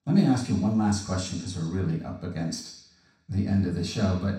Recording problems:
off-mic speech; far
room echo; noticeable; dies away in 0.7 s

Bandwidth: 16.5 kHz